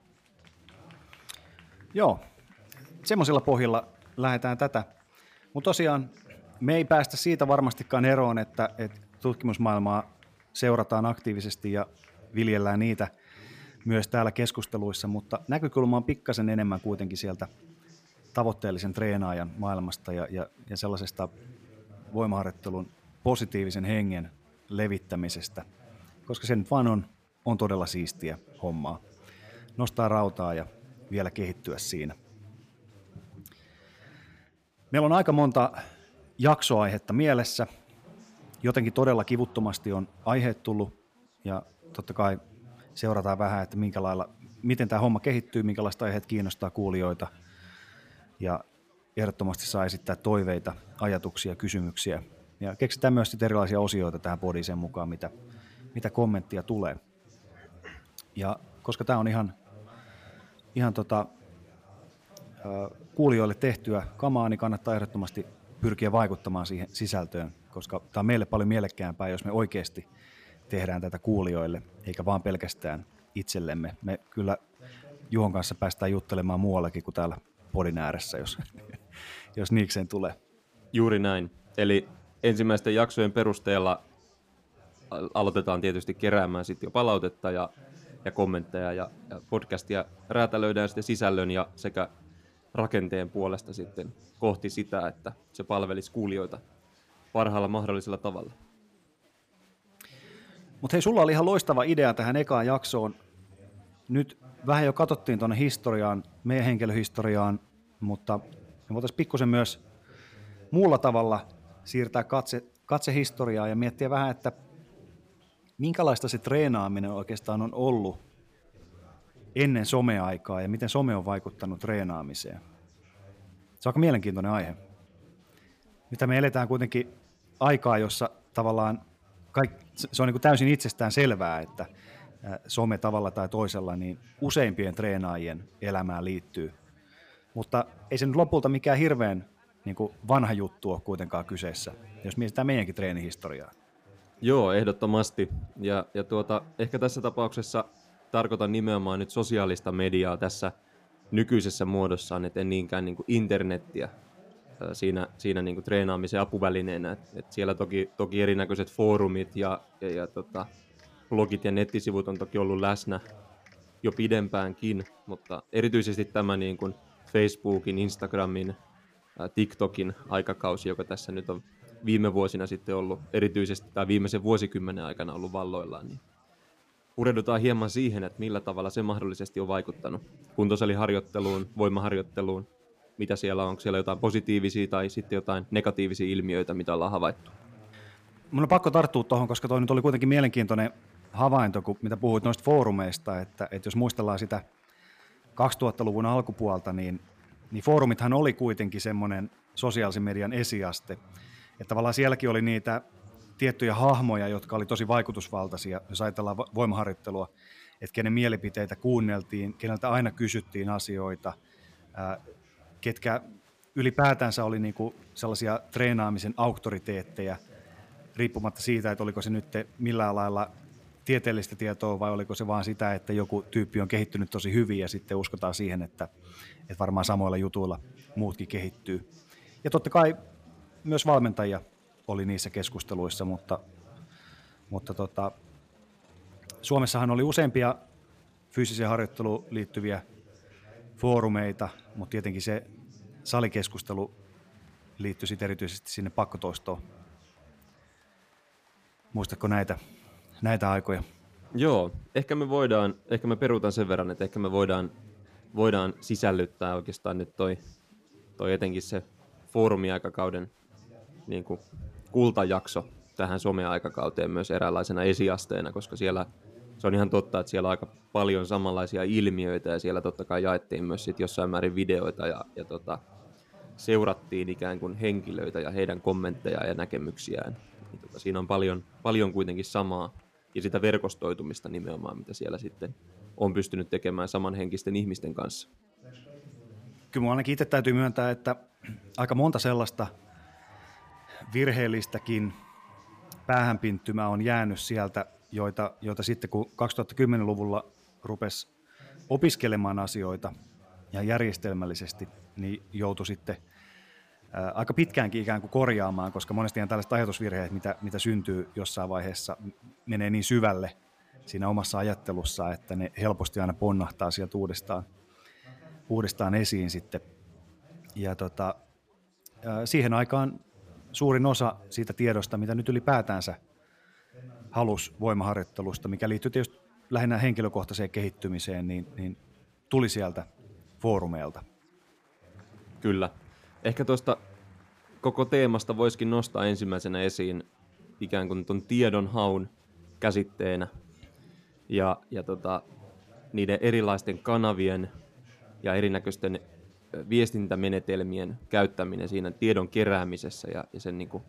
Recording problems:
chatter from many people; faint; throughout; 25 dB below the speech

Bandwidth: 15 kHz